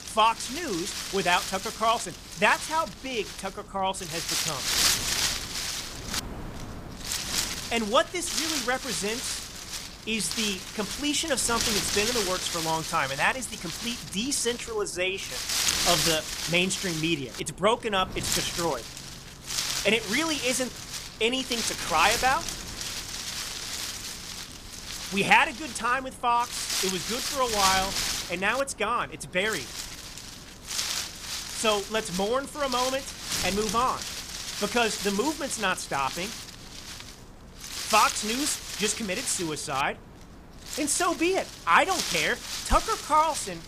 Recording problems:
wind noise on the microphone; heavy; 5 dB below the speech

